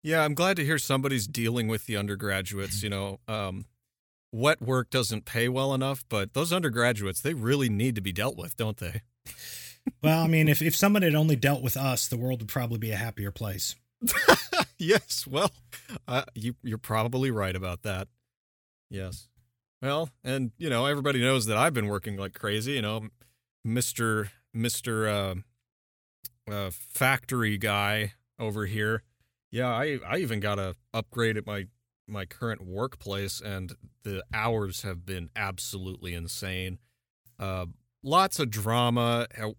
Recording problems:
none

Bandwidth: 18 kHz